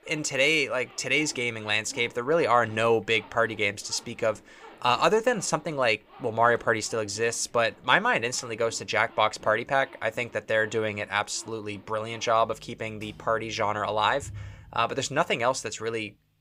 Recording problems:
household noises; faint; throughout; 25 dB below the speech

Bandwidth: 15.5 kHz